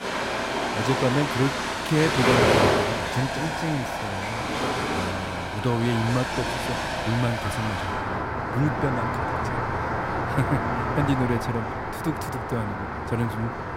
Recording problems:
rain or running water; very loud; throughout; 2 dB above the speech

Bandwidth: 16 kHz